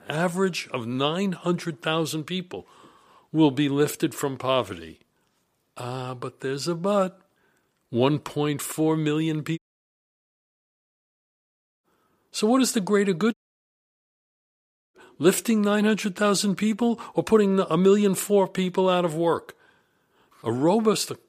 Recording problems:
audio cutting out; at 9.5 s for 2.5 s and at 13 s for 1.5 s

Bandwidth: 15 kHz